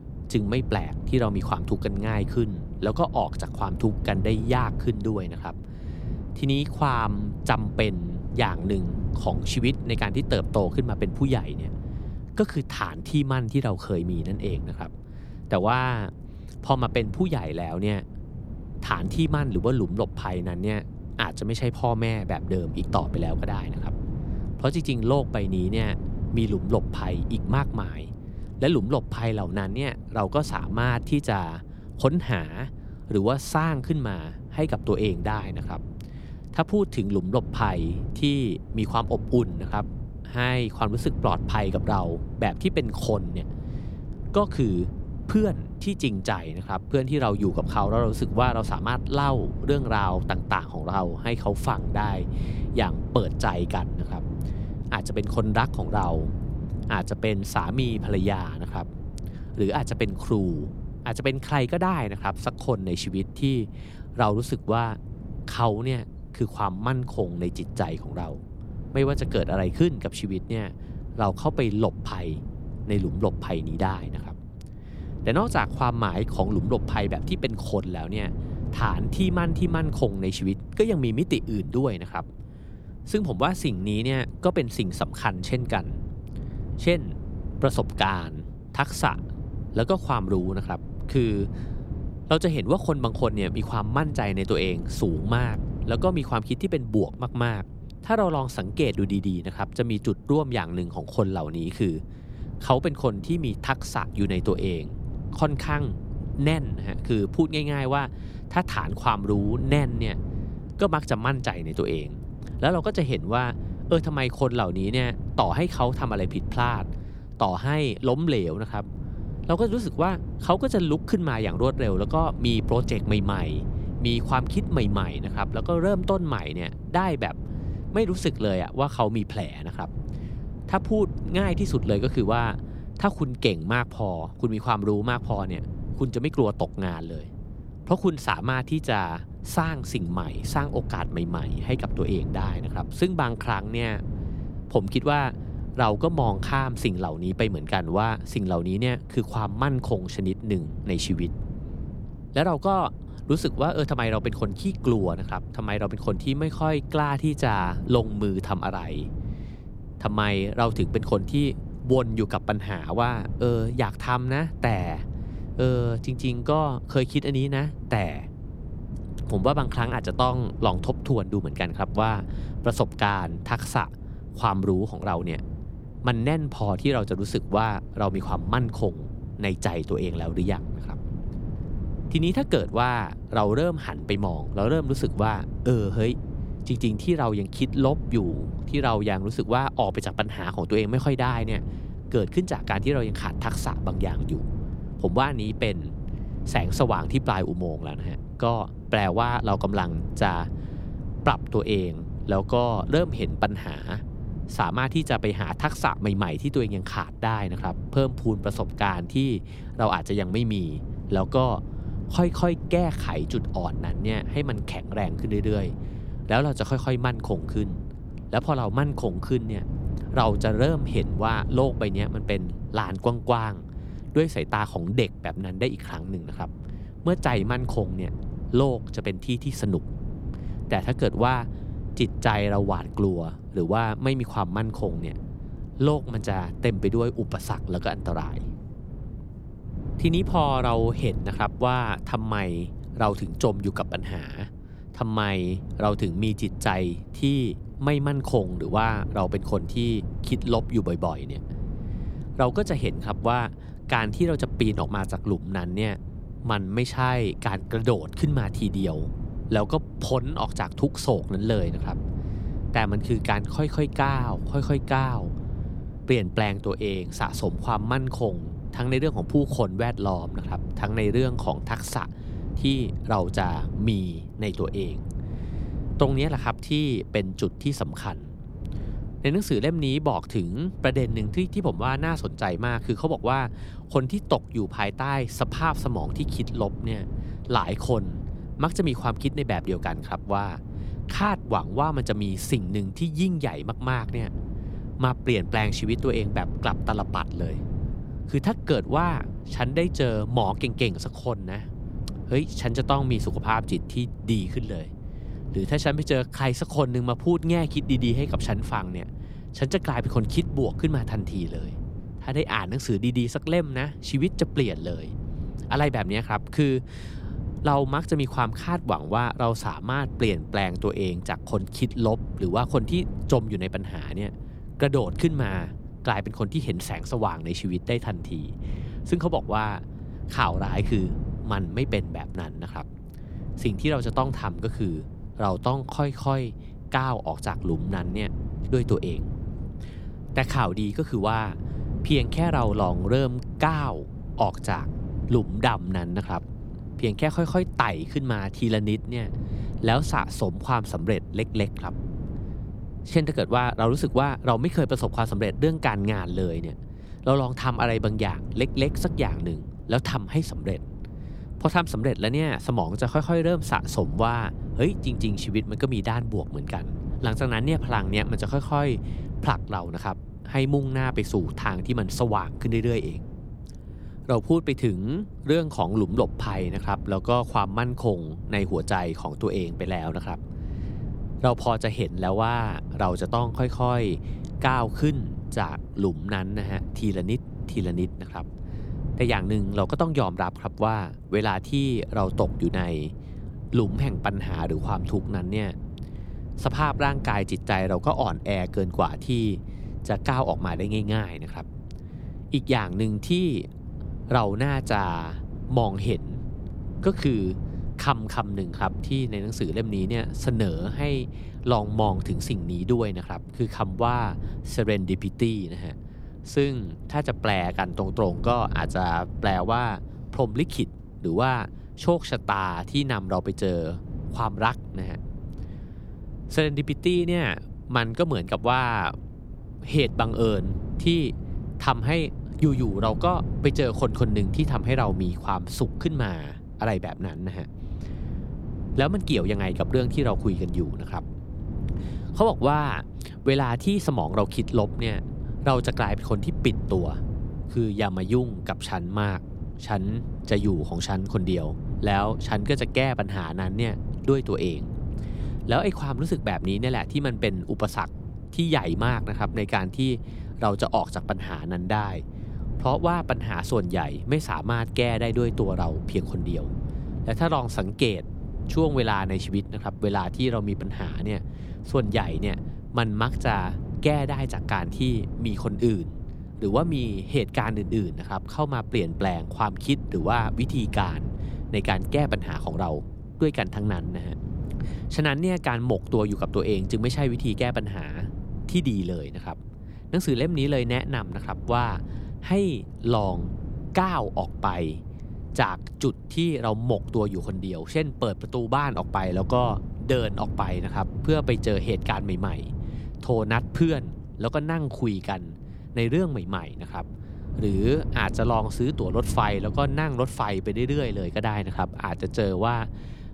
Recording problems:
wind noise on the microphone; occasional gusts; 15 dB below the speech

